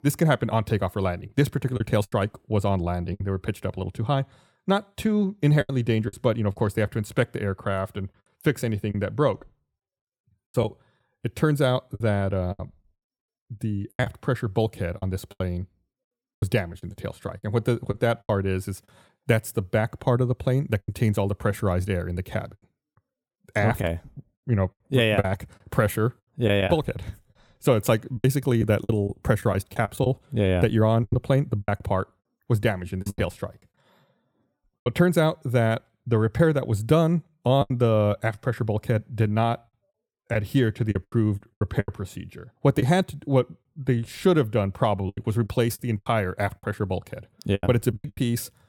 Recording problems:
choppy; very; 7% of the speech affected

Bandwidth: 18 kHz